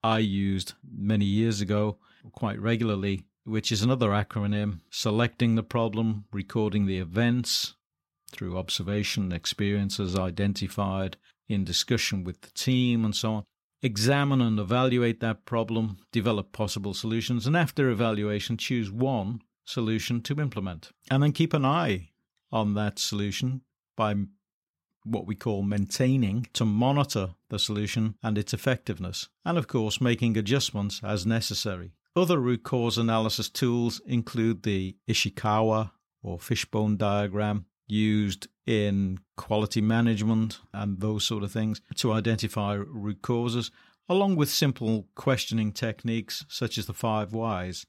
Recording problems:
none

